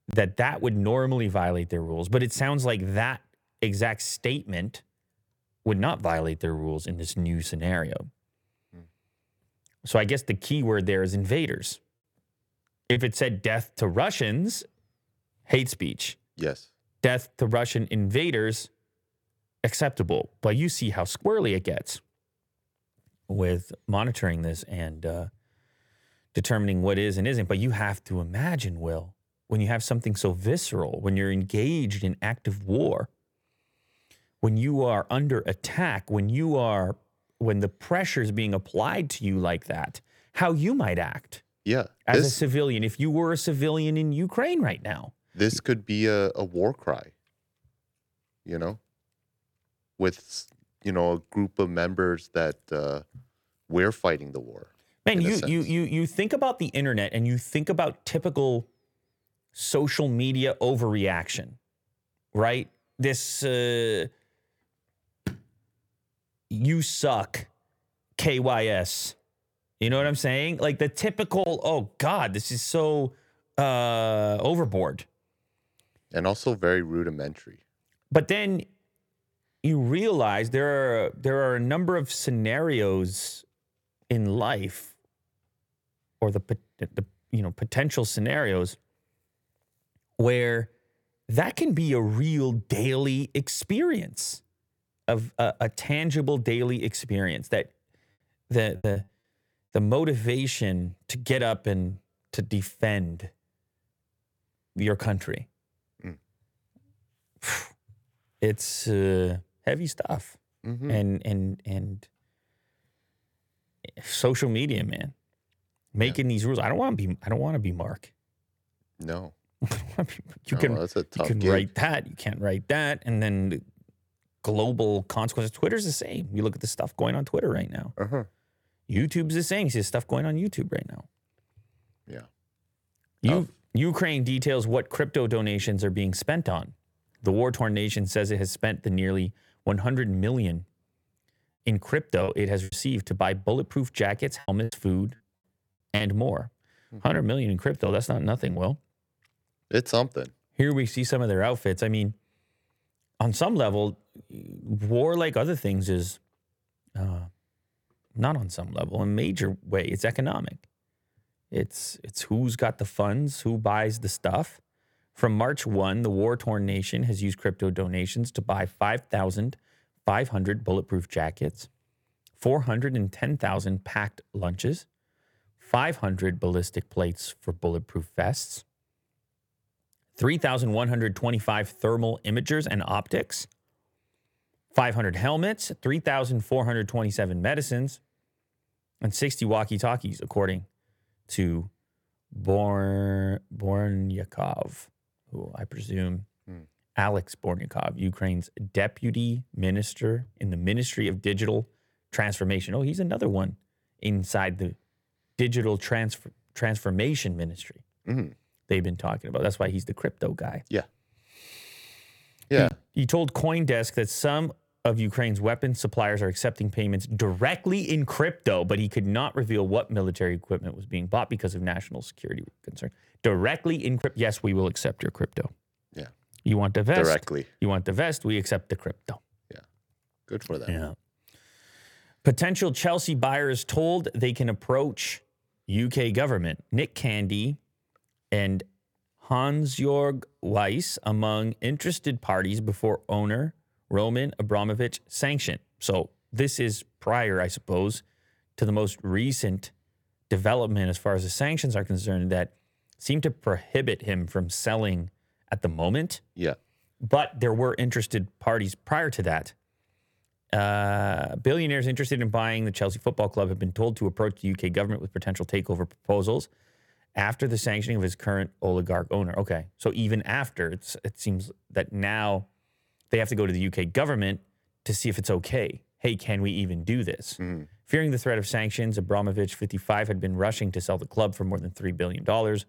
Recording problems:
choppy; very; at 13 s, at 1:39 and from 2:22 to 2:26; 8% of the speech affected

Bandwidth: 18.5 kHz